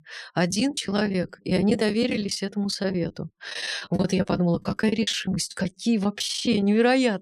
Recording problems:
choppy; very; 15% of the speech affected

